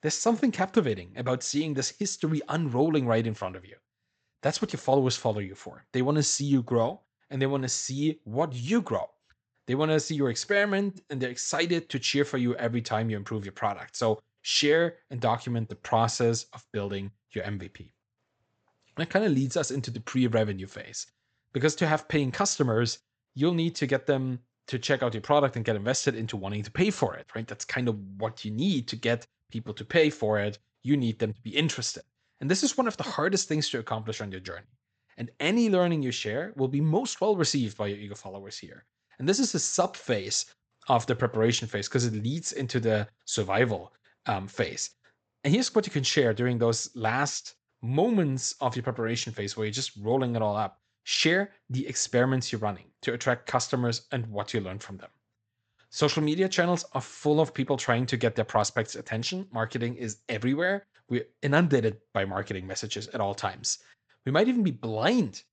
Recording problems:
high frequencies cut off; noticeable; nothing above 8 kHz

